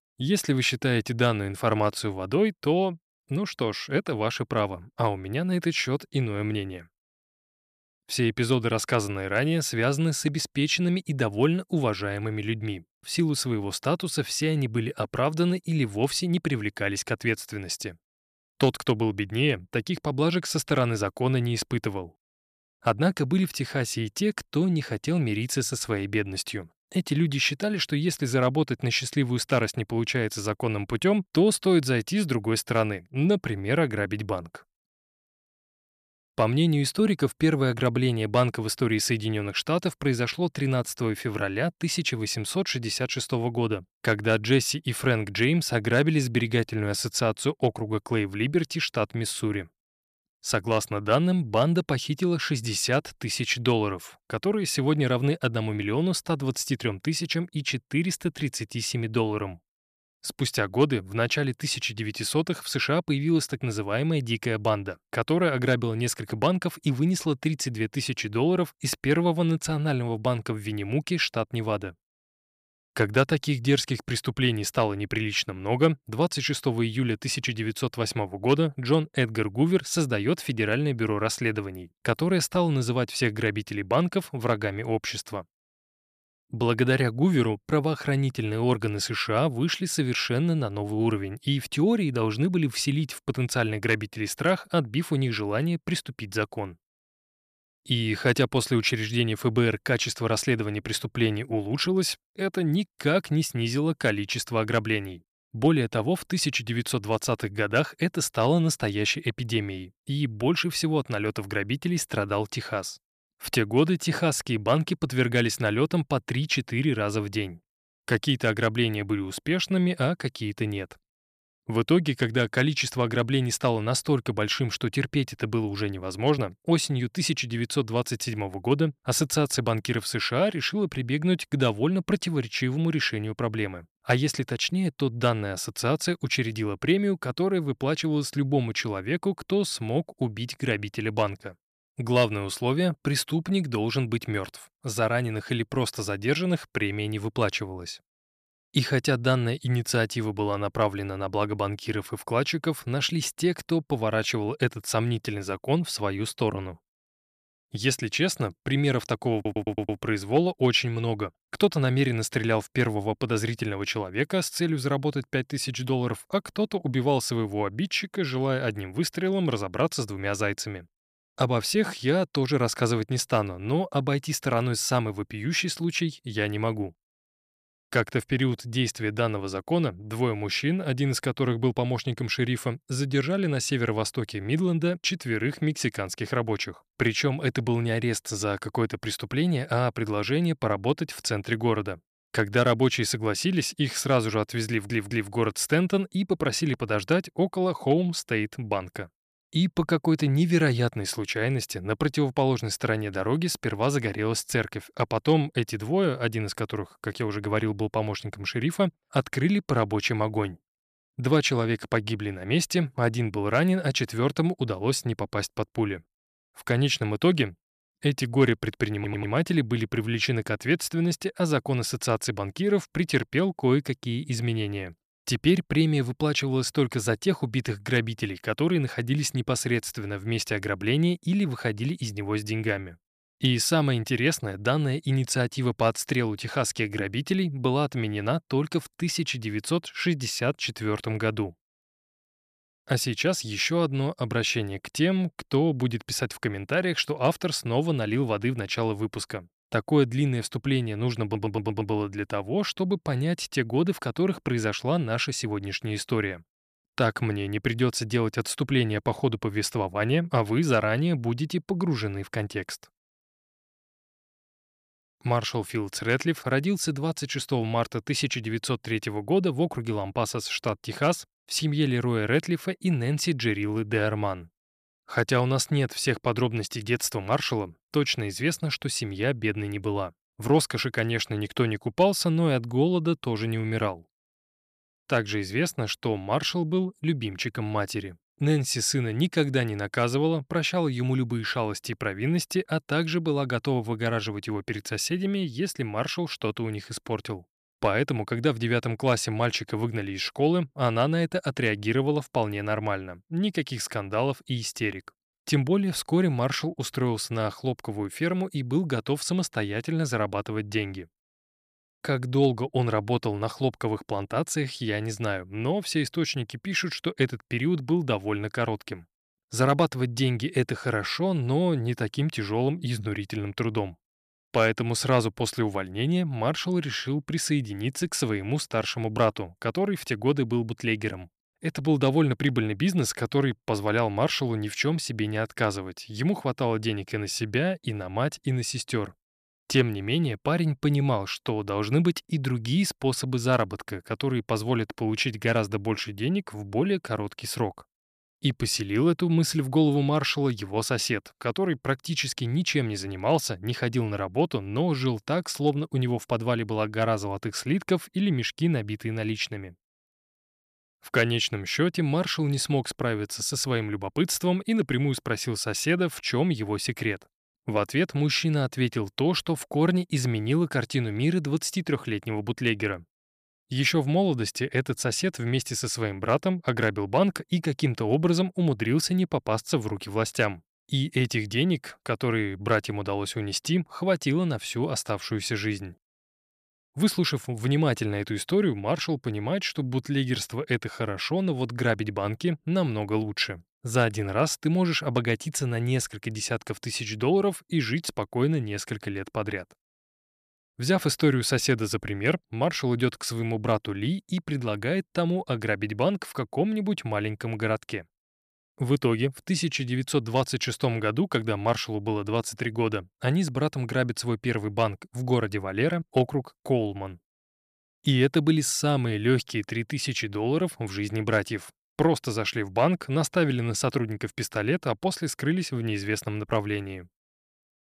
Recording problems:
audio stuttering; 4 times, first at 2:39

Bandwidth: 14.5 kHz